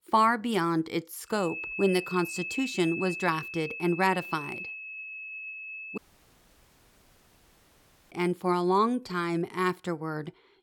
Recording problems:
high-pitched whine; loud; from 1.5 to 6 s; 2.5 kHz, 8 dB below the speech
audio cutting out; at 6 s for 2 s

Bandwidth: 18.5 kHz